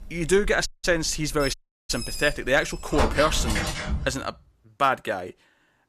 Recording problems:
animal sounds; loud; until 3.5 s; 5 dB below the speech
audio cutting out; at 0.5 s and at 1.5 s

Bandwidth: 14.5 kHz